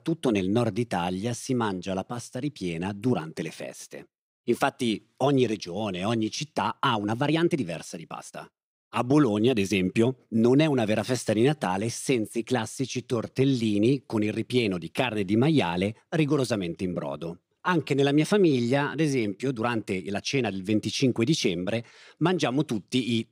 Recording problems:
uneven, jittery; strongly; from 5 to 20 s

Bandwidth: 15.5 kHz